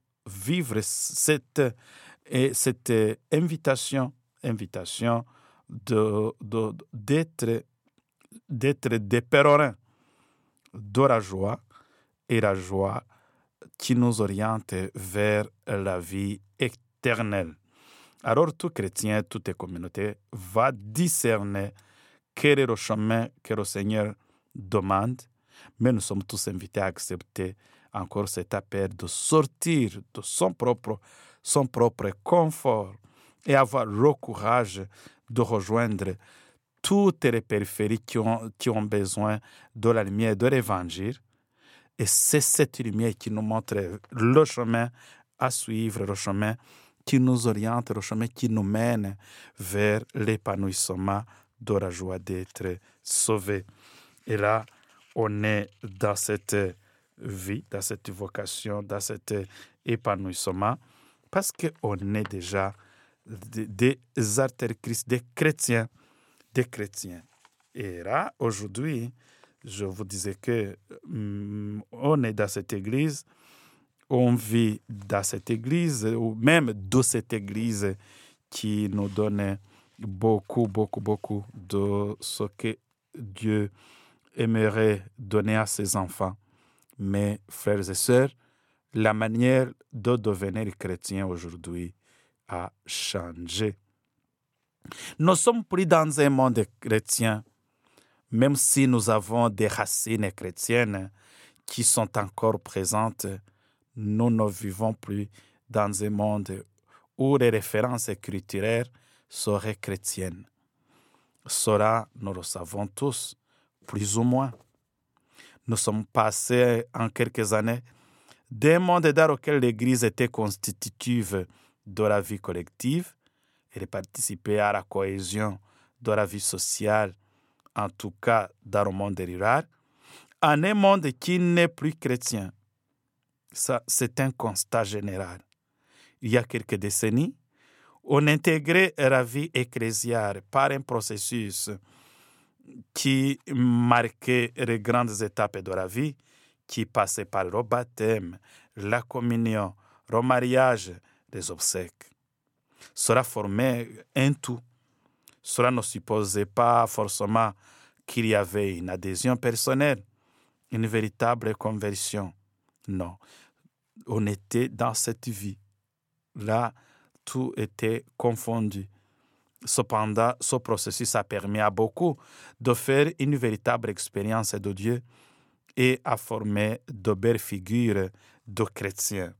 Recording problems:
none

